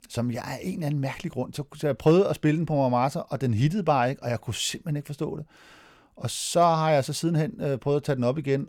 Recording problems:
none

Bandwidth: 17 kHz